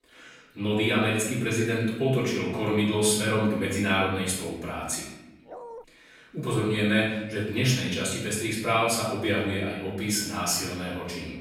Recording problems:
off-mic speech; far
room echo; noticeable; dies away in 1 s
dog barking; faint; at 5.5 s; peak 15 dB below the speech

